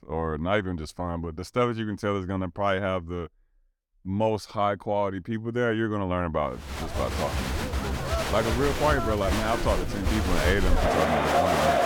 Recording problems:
crowd noise; very loud; from 7 s on; 1 dB above the speech

